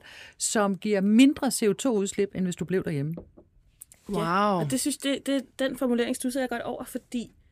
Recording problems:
none

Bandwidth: 15 kHz